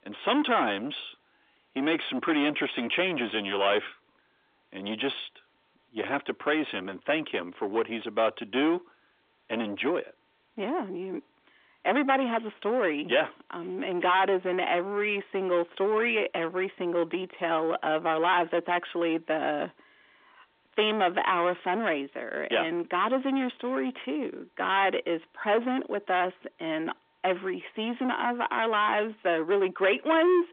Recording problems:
distortion; heavy; 9 dB below the speech
phone-call audio; nothing above 3.5 kHz

